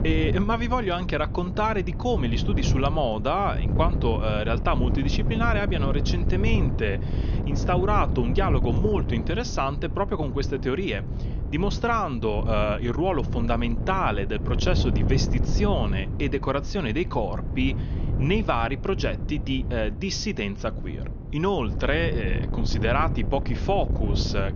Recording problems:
high frequencies cut off; noticeable; nothing above 6.5 kHz
wind noise on the microphone; occasional gusts; 10 dB below the speech

